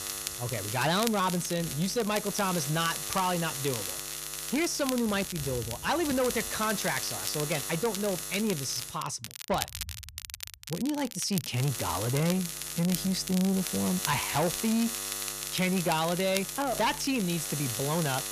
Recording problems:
distortion; slight; 10 dB below the speech
electrical hum; loud; until 9 s and from 12 s on; 50 Hz, 7 dB below the speech
crackle, like an old record; loud; 9 dB below the speech

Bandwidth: 14.5 kHz